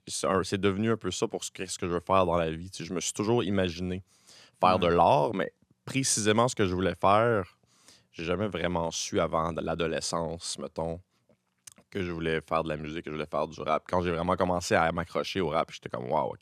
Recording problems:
none

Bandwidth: 13.5 kHz